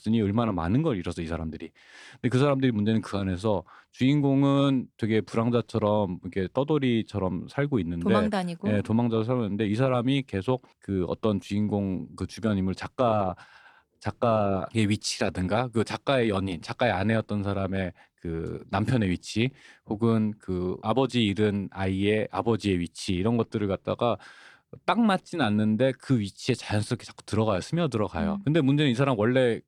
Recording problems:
none

